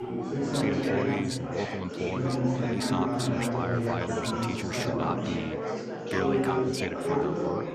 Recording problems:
chatter from many people; very loud; throughout; 5 dB above the speech

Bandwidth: 14.5 kHz